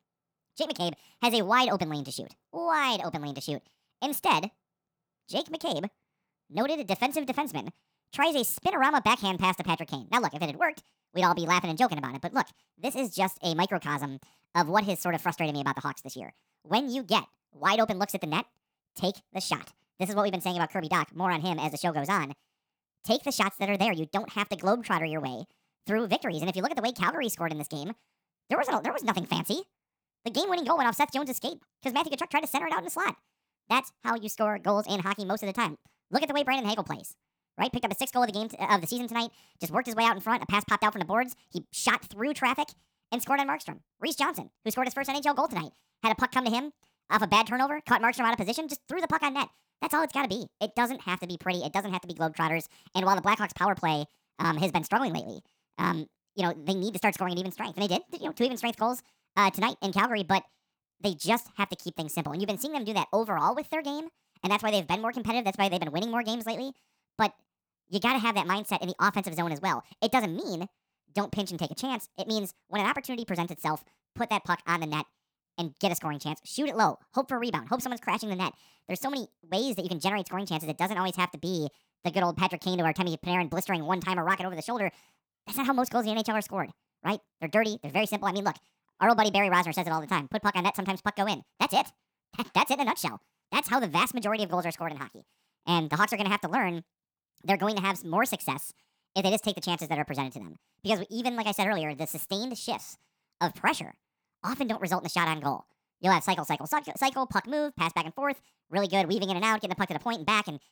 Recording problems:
wrong speed and pitch; too fast and too high; 1.6 times normal speed

